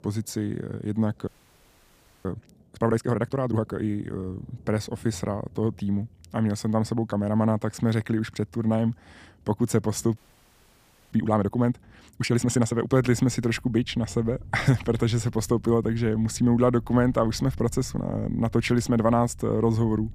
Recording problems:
rain or running water; faint; throughout; 20 dB below the speech
audio freezing; at 1.5 s for 1 s and at 10 s for 1 s

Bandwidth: 15 kHz